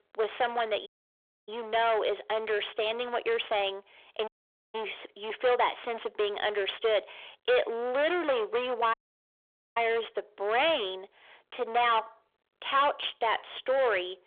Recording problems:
distortion; heavy; 17% of the sound clipped
phone-call audio; nothing above 3.5 kHz
audio cutting out; at 1 s for 0.5 s, at 4.5 s and at 9 s for 1 s

